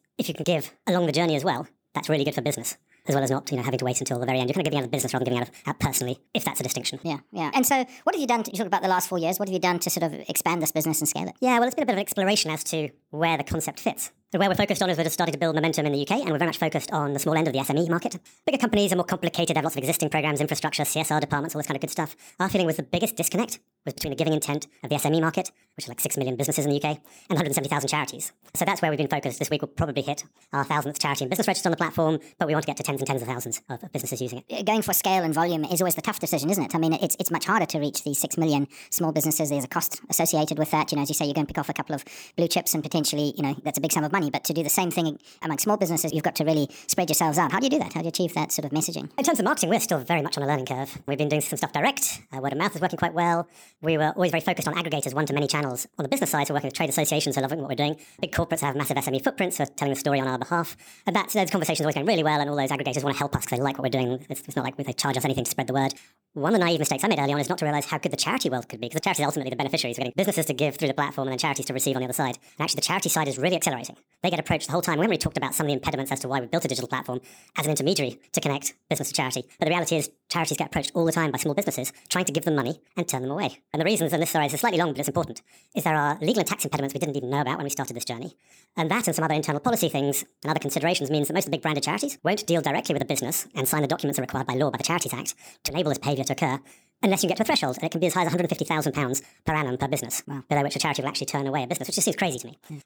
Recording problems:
wrong speed and pitch; too fast and too high; 1.5 times normal speed

